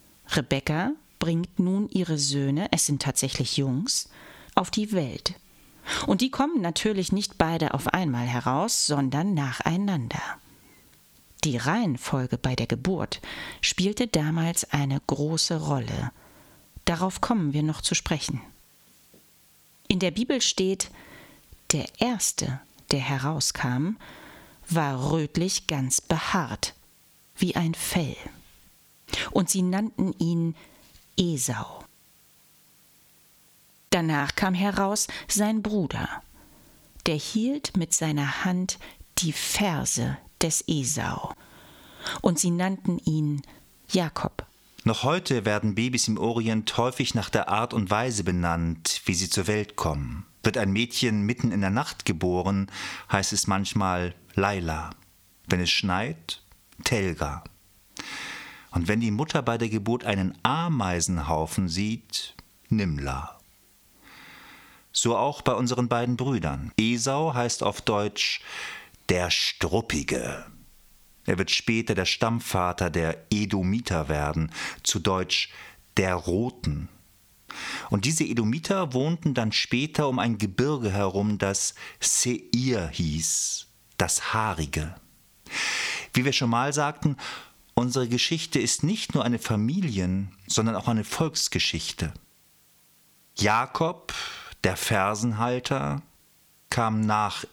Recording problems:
squashed, flat; somewhat

